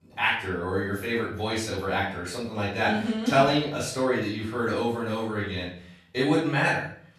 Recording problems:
off-mic speech; far
room echo; noticeable; dies away in 0.5 s

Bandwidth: 13.5 kHz